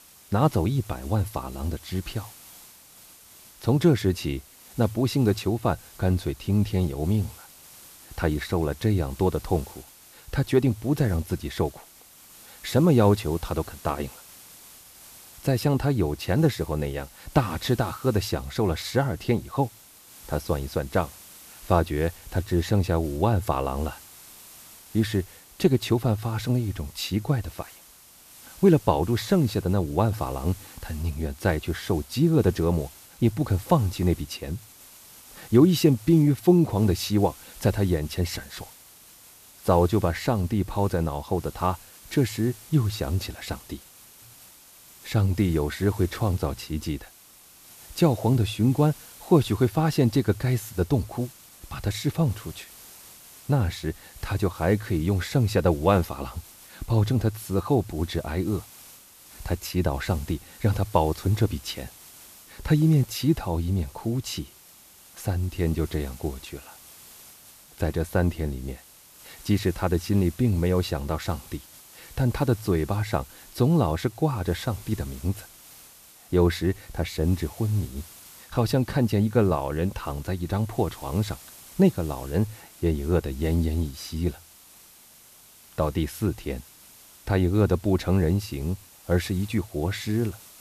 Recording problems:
hiss; faint; throughout; 20 dB below the speech

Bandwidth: 14.5 kHz